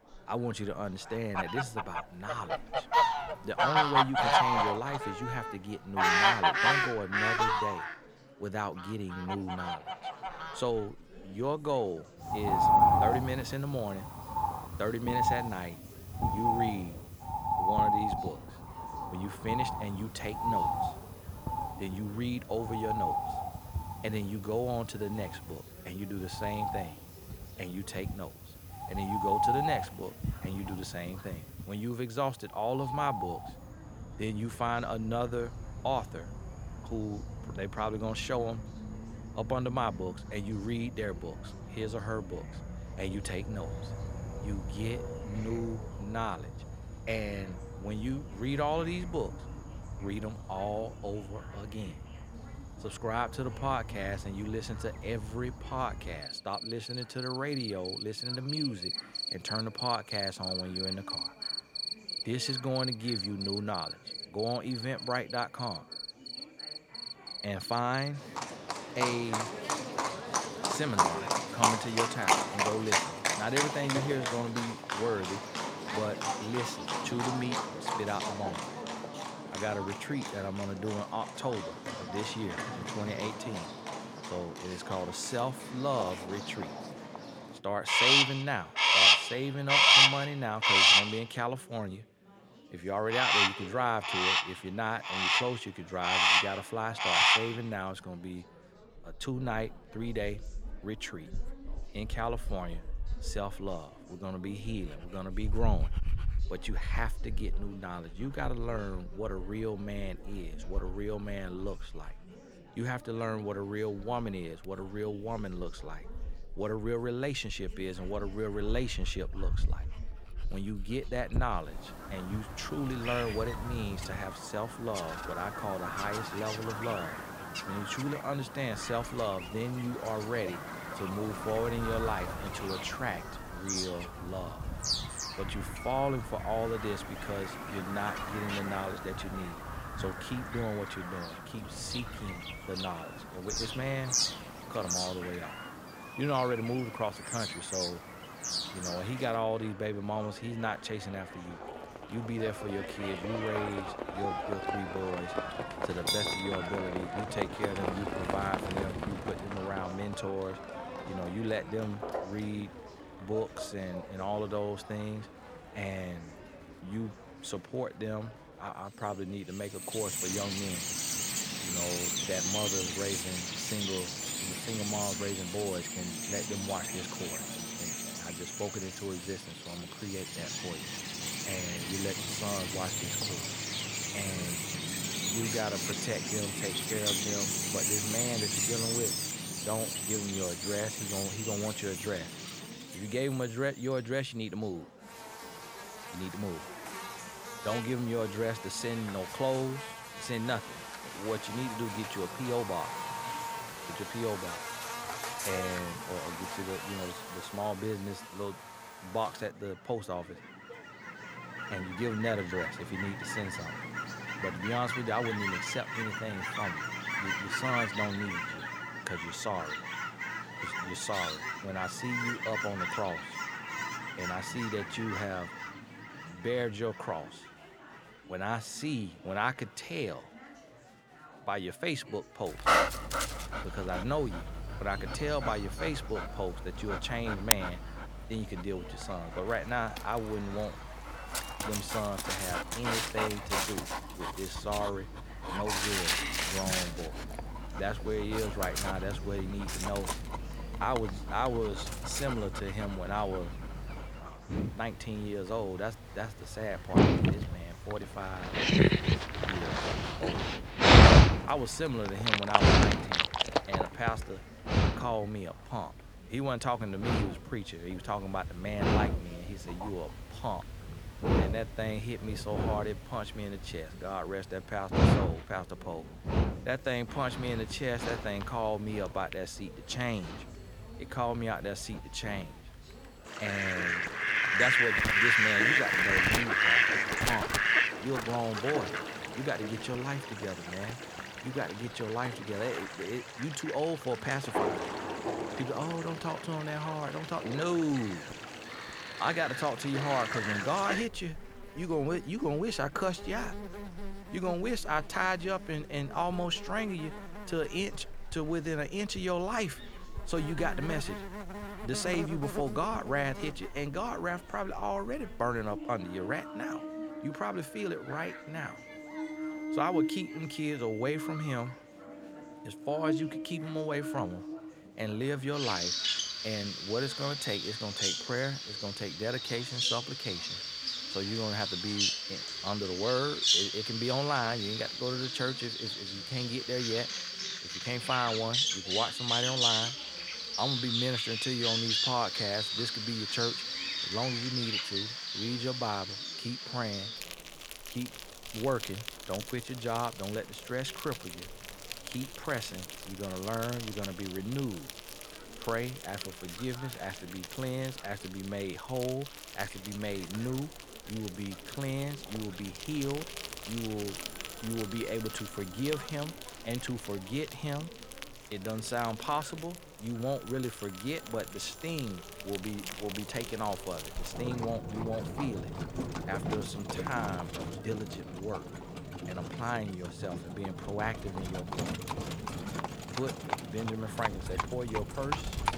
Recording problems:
animal sounds; very loud; throughout; 4 dB above the speech
chatter from many people; noticeable; throughout; 20 dB below the speech
alarms or sirens; faint; throughout; 25 dB below the speech

